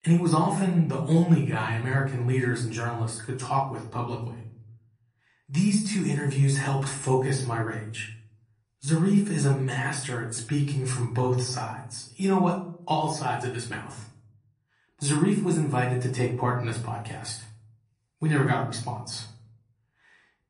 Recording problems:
off-mic speech; far
room echo; slight; dies away in 0.6 s
garbled, watery; slightly; nothing above 10.5 kHz

